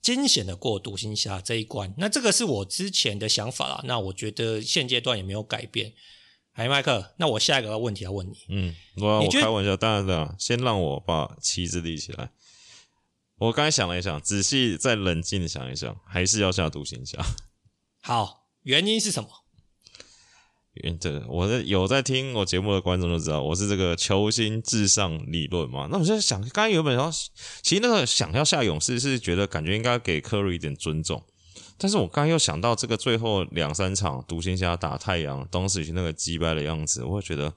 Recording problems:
none

